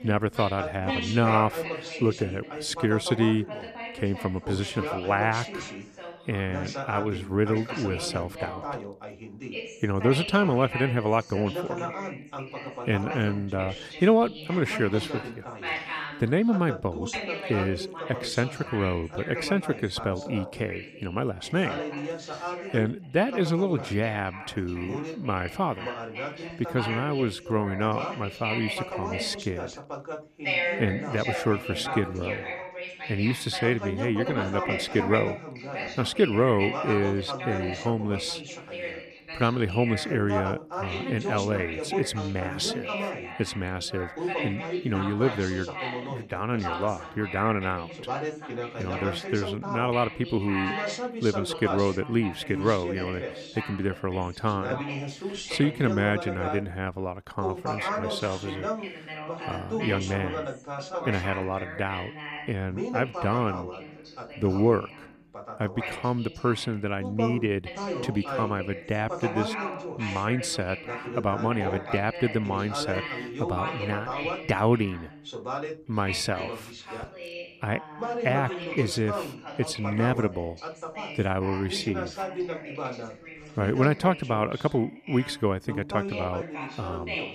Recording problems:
background chatter; loud; throughout; 2 voices, 6 dB below the speech

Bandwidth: 14.5 kHz